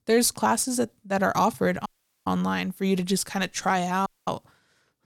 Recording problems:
audio cutting out; at 2 s and at 4 s

